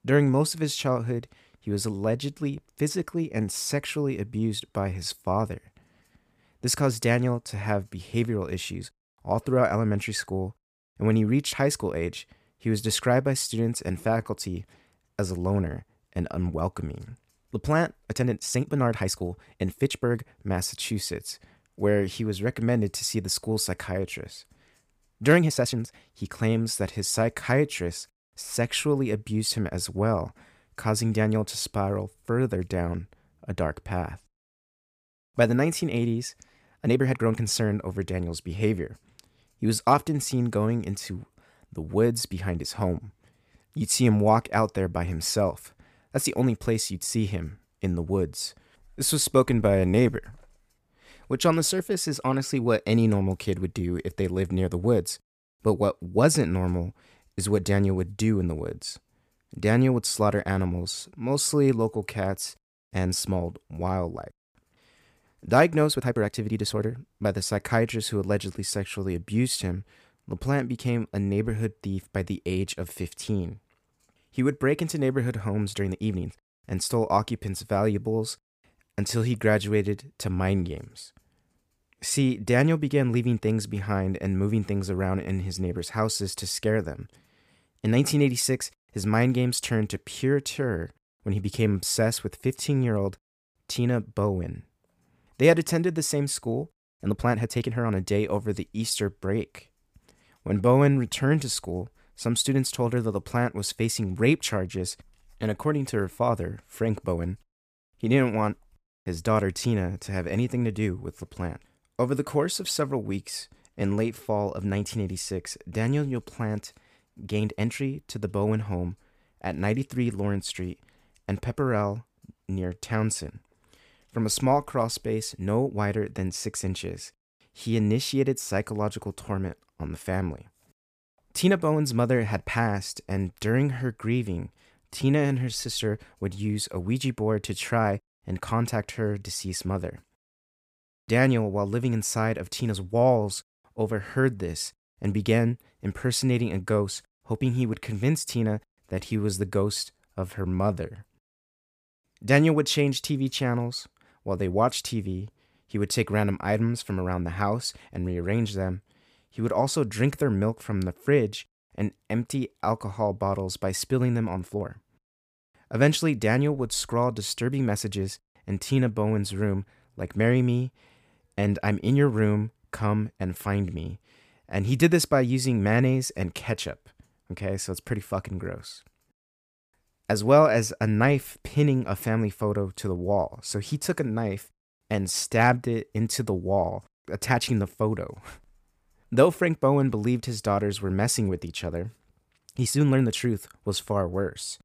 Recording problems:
uneven, jittery; strongly; from 4.5 s to 3:13

